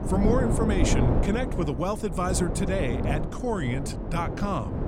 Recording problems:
wind noise on the microphone; heavy; 4 dB below the speech

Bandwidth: 16 kHz